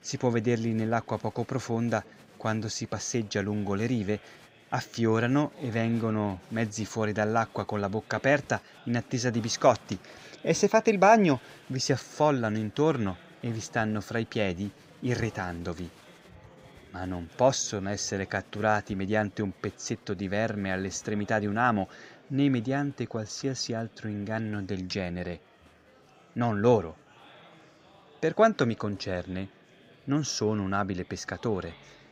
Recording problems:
murmuring crowd; faint; throughout; 25 dB below the speech

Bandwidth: 15.5 kHz